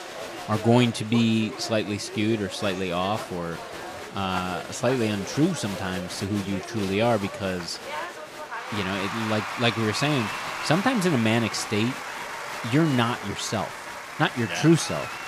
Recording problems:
crowd noise; loud; throughout; 8 dB below the speech

